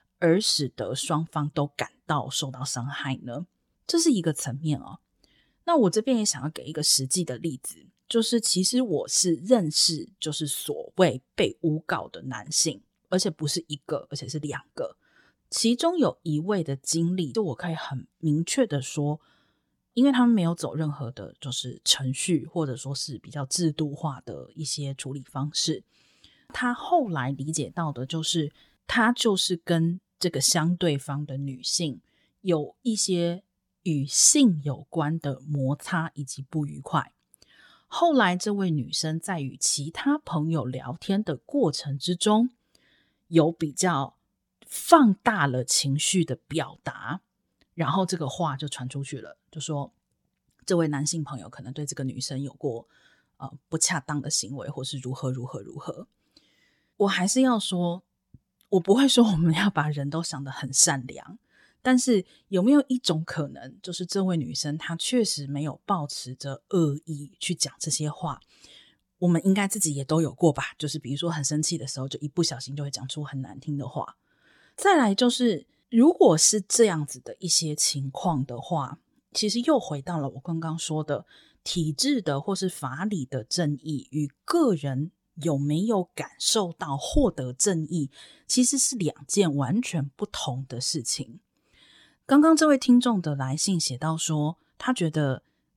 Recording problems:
none

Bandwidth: 17.5 kHz